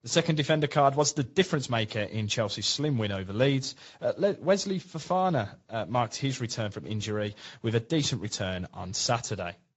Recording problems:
high frequencies cut off; noticeable; nothing above 7.5 kHz
garbled, watery; slightly

